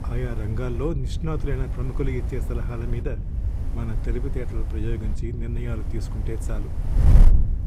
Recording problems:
wind noise on the microphone; heavy; 6 dB below the speech

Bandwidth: 15.5 kHz